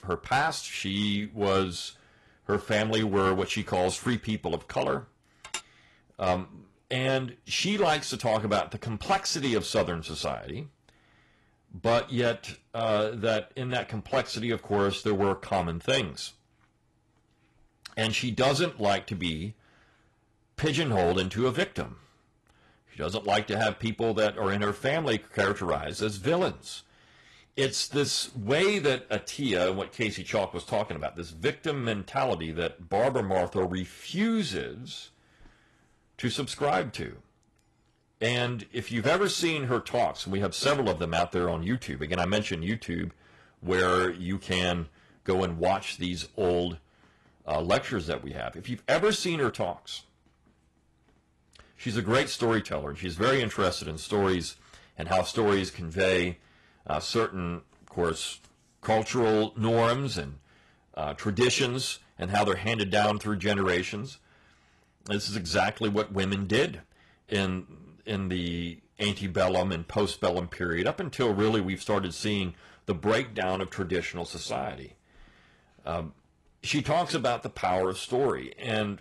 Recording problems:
distortion; slight; 3% of the sound clipped
garbled, watery; slightly; nothing above 11.5 kHz
clattering dishes; noticeable; at 5.5 s; peak 9 dB below the speech

